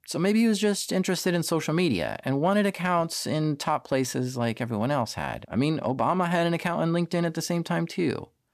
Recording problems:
none

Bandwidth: 14.5 kHz